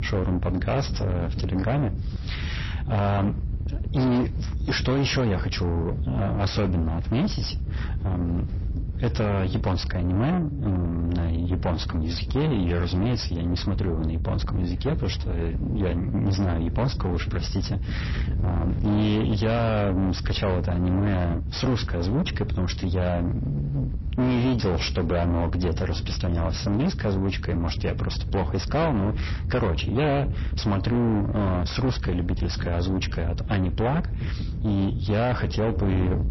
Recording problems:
distortion; heavy; 6 dB below the speech
garbled, watery; slightly; nothing above 5.5 kHz
wind noise on the microphone; occasional gusts; 10 dB below the speech

